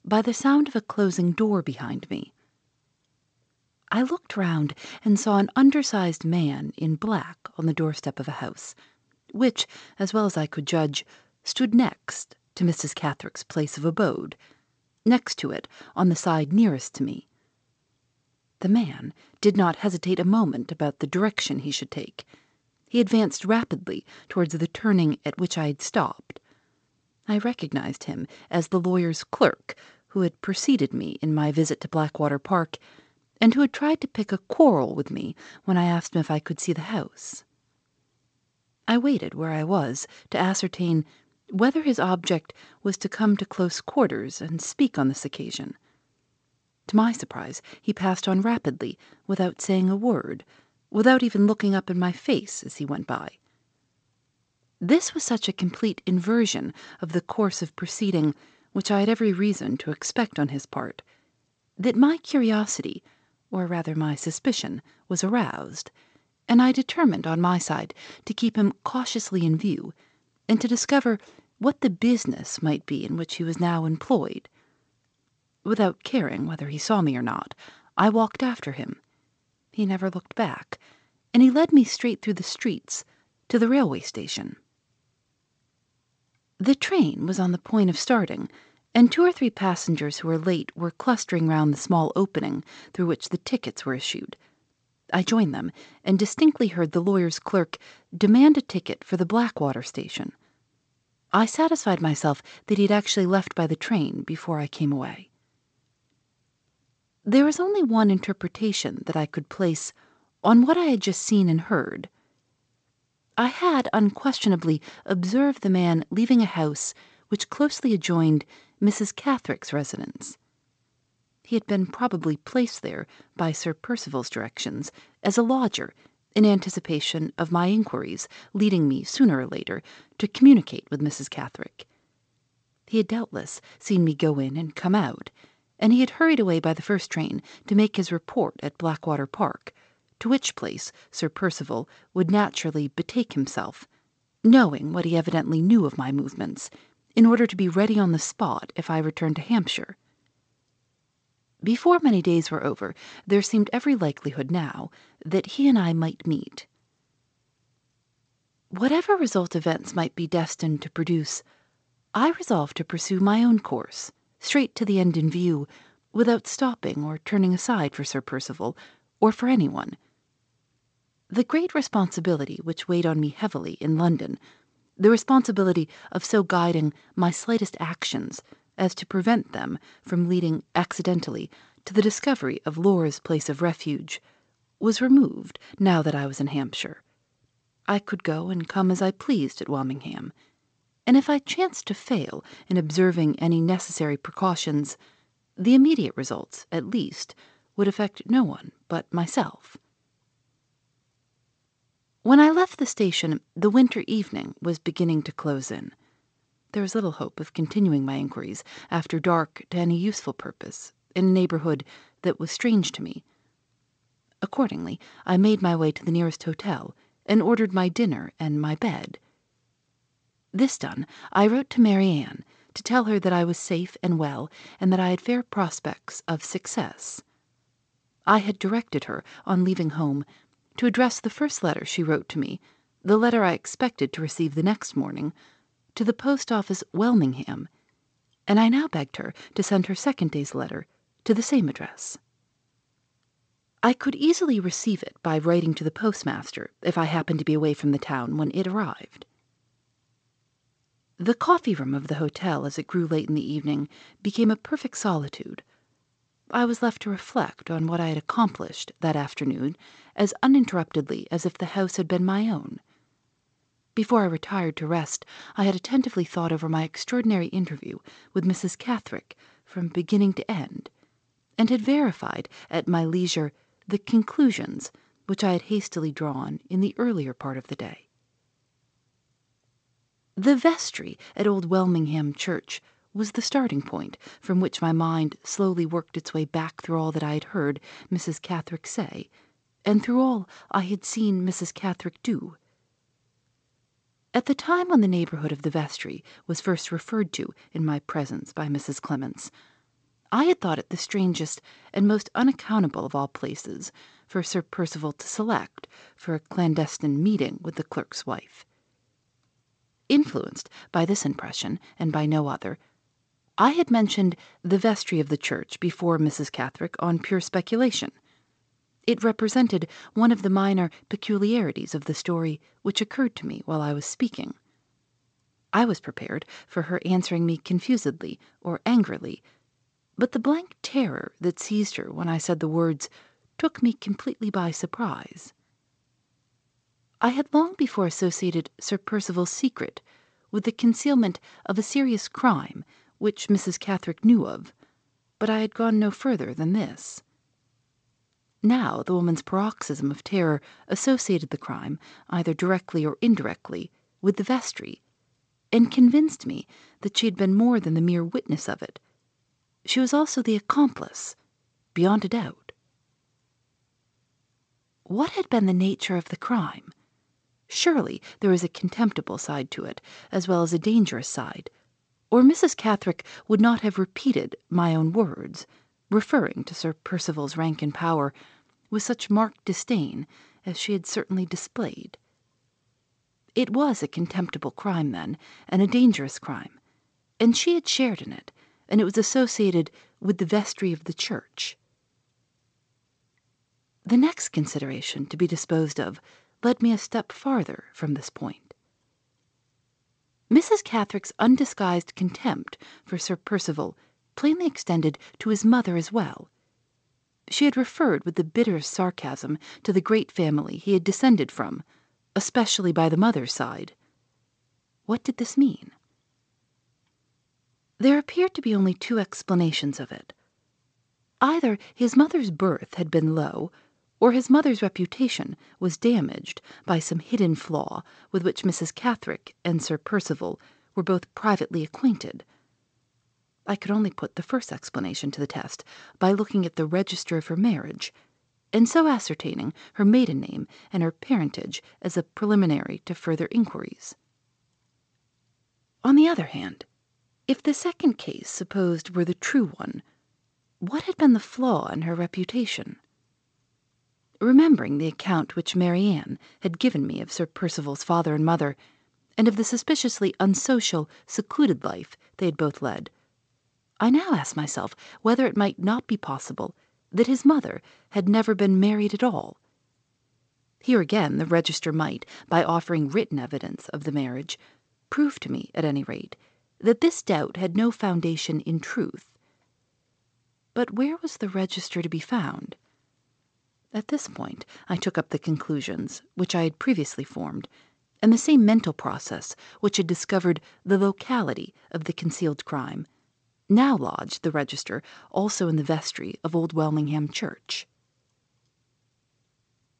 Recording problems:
garbled, watery; slightly; nothing above 8 kHz

